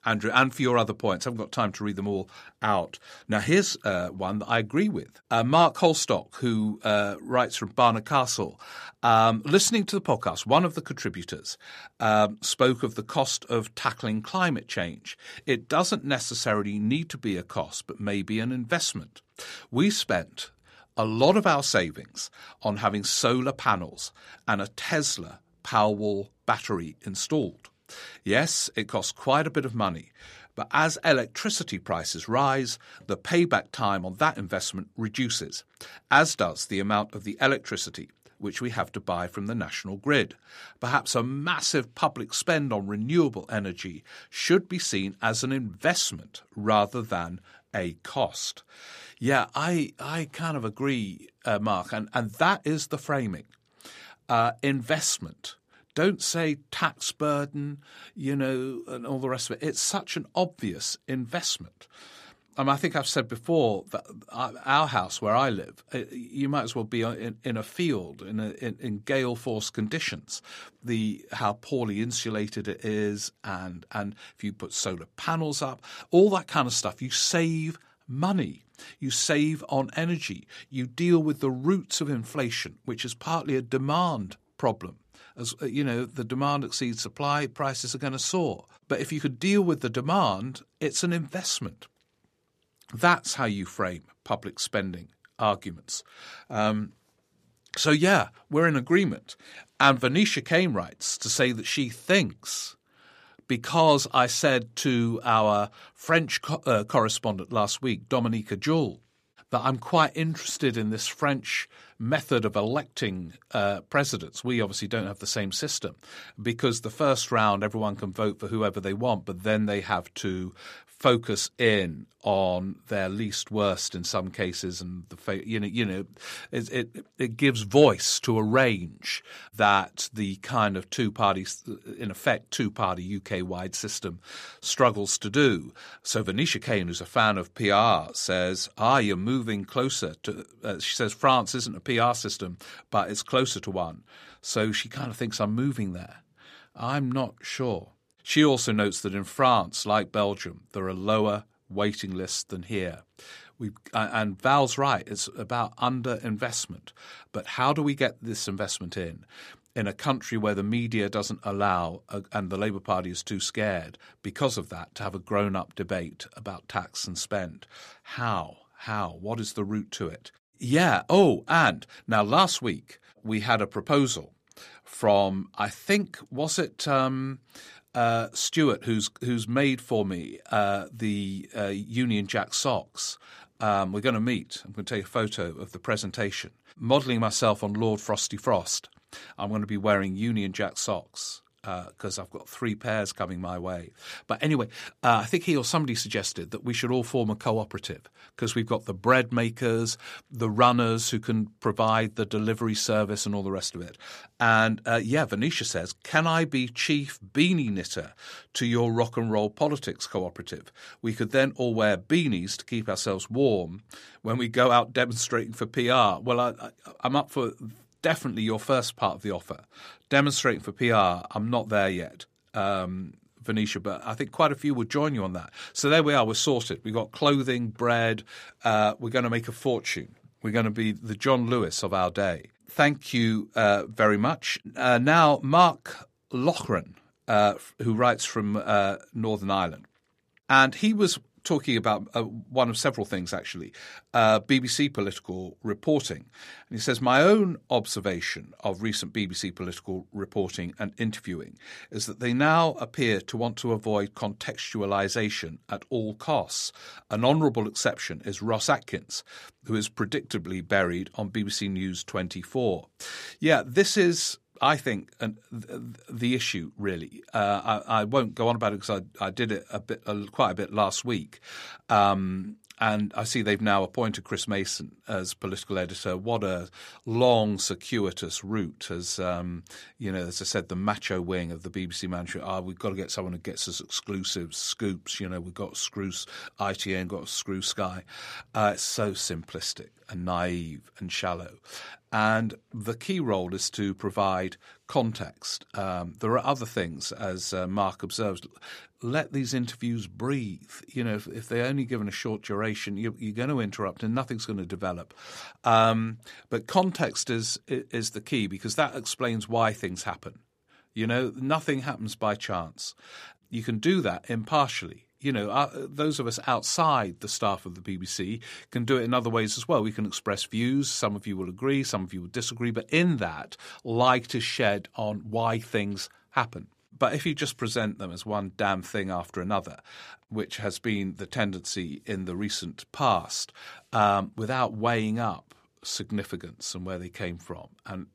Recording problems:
none

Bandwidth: 14.5 kHz